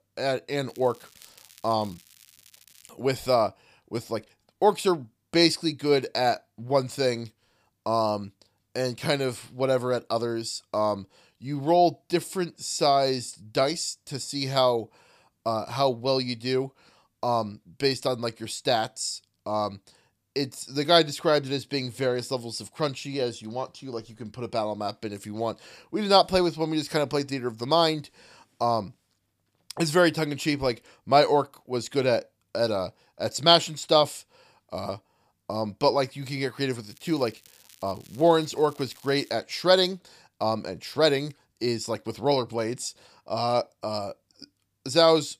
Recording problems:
crackling; faint; from 0.5 to 3 s and from 37 to 39 s; 25 dB below the speech

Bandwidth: 15 kHz